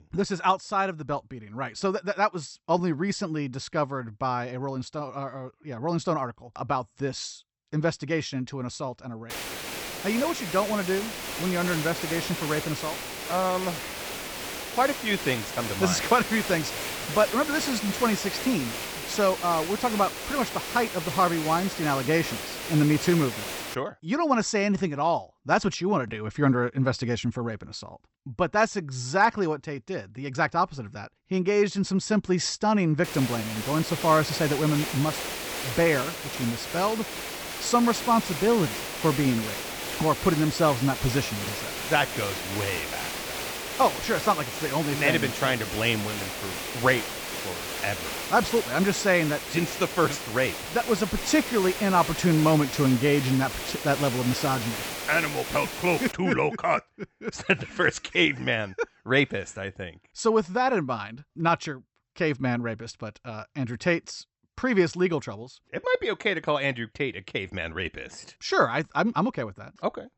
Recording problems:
high frequencies cut off; noticeable; nothing above 8 kHz
hiss; loud; from 9.5 to 24 s and from 33 to 56 s; 6 dB below the speech

